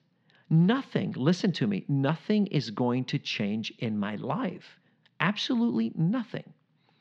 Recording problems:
muffled; slightly; fading above 4 kHz

